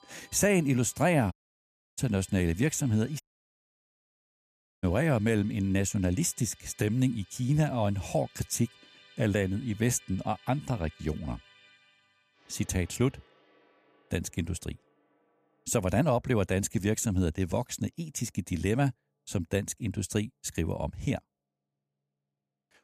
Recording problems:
background music; faint; throughout; 25 dB below the speech
audio cutting out; at 1.5 s for 0.5 s and at 3 s for 1.5 s

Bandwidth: 14.5 kHz